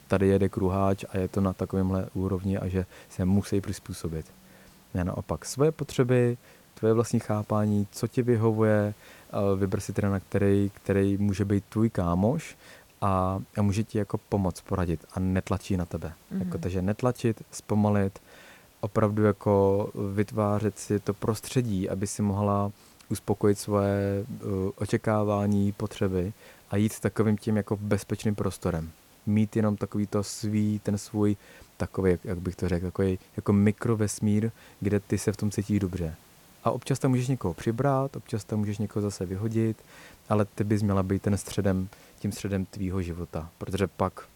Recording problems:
hiss; faint; throughout; 30 dB below the speech

